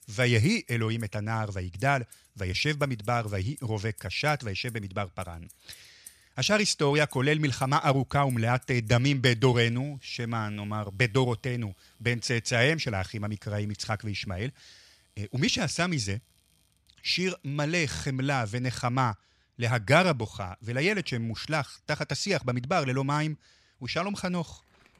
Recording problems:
household noises; faint; throughout; 25 dB below the speech

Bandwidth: 14.5 kHz